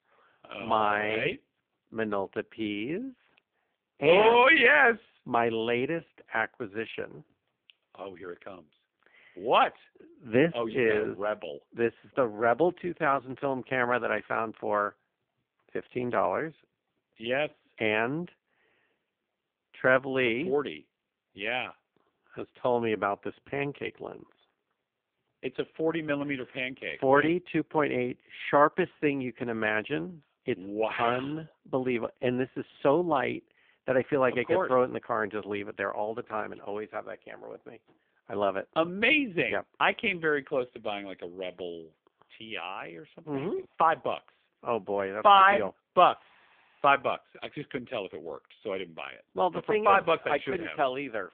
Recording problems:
phone-call audio; poor line; nothing above 3.5 kHz

